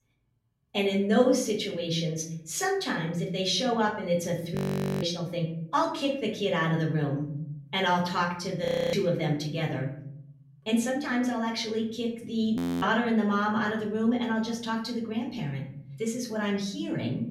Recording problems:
off-mic speech; far
room echo; slight; dies away in 0.8 s
audio freezing; at 4.5 s, at 8.5 s and at 13 s

